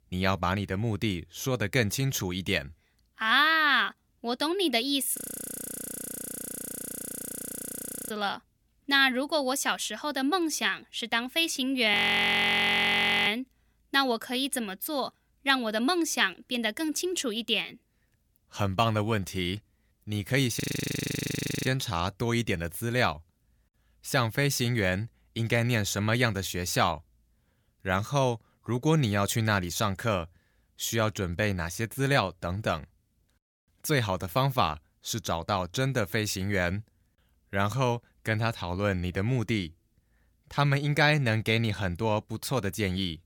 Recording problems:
audio freezing; at 5 s for 3 s, at 12 s for 1.5 s and at 21 s for 1 s

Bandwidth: 18 kHz